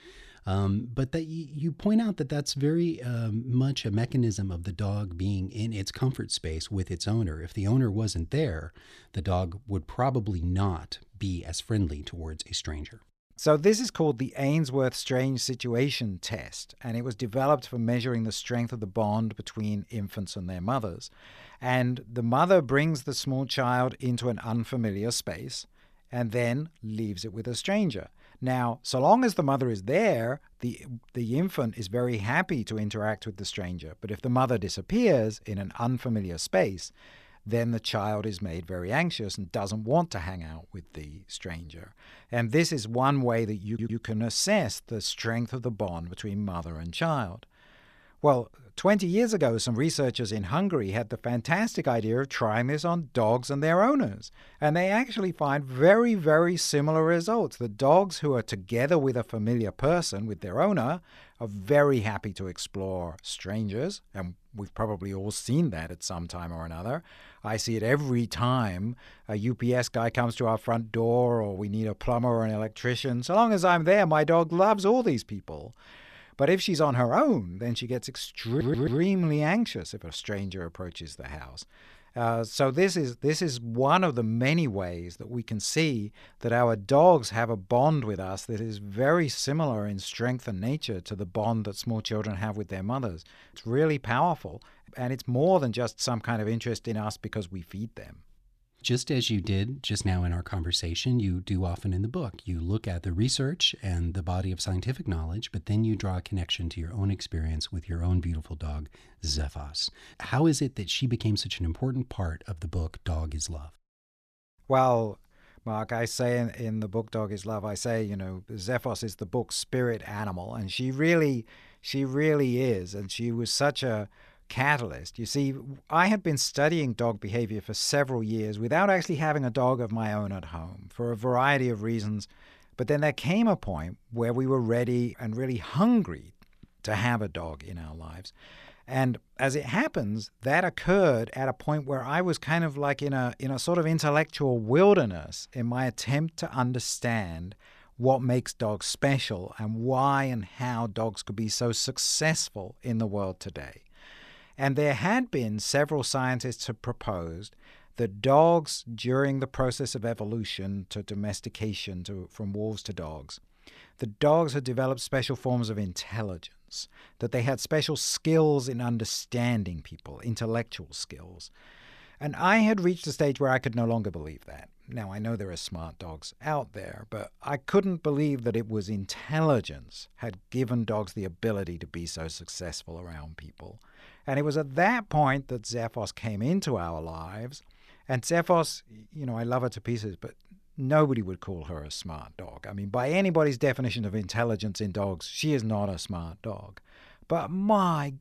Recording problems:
audio stuttering; at 44 s and at 1:18

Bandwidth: 14.5 kHz